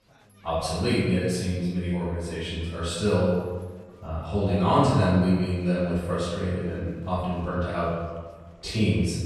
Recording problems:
room echo; strong; dies away in 1.2 s
off-mic speech; far
chatter from many people; faint; throughout; 30 dB below the speech

